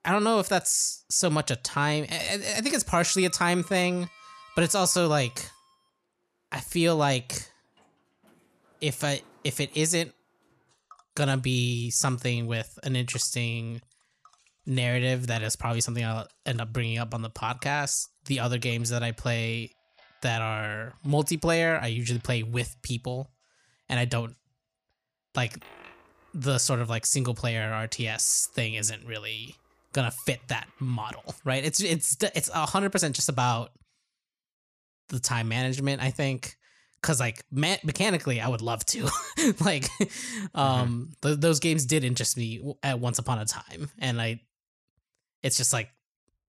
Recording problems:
household noises; faint; until 31 s; 30 dB below the speech

